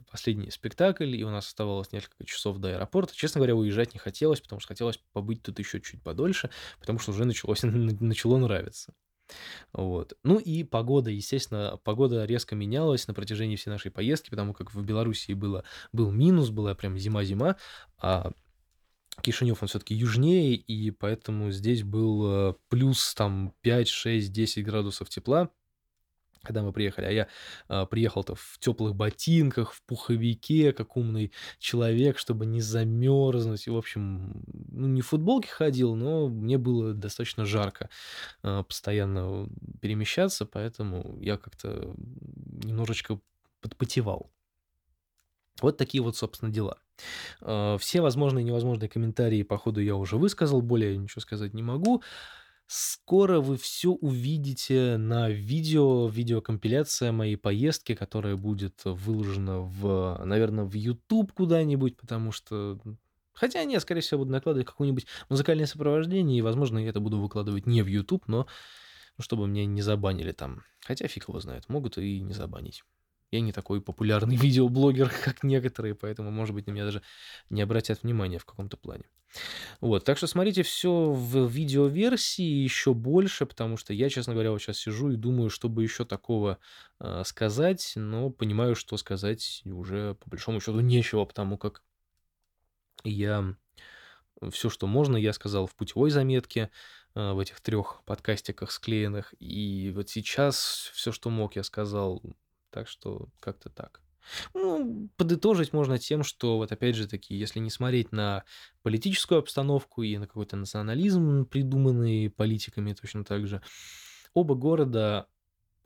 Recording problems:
none

